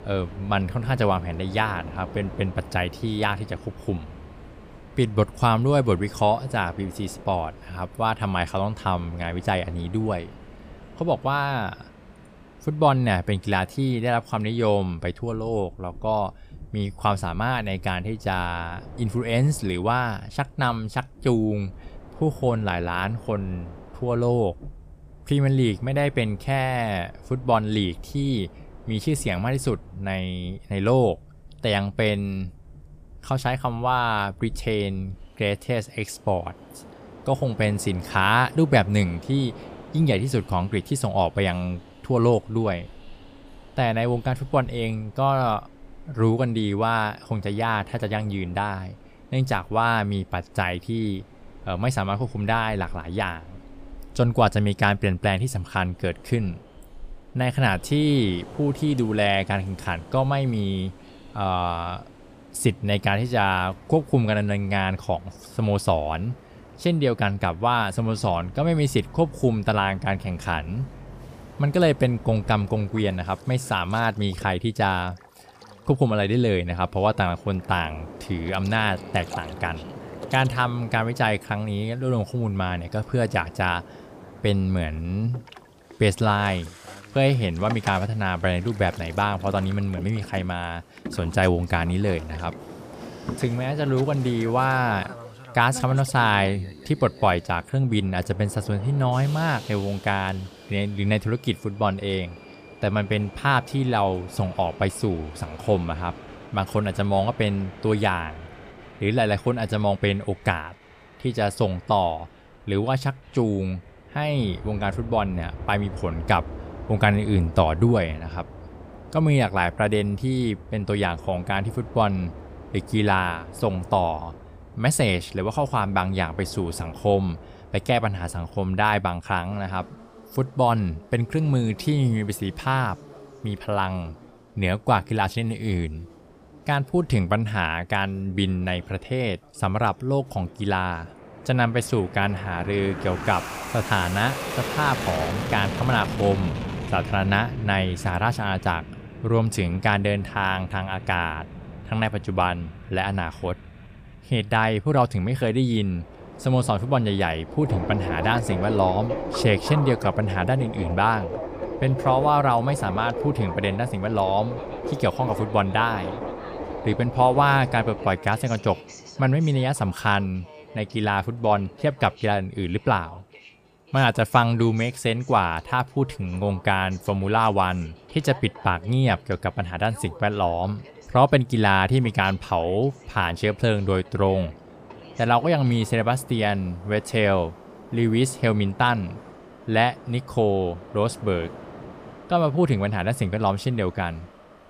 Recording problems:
train or aircraft noise; noticeable; throughout; 15 dB below the speech

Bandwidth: 15 kHz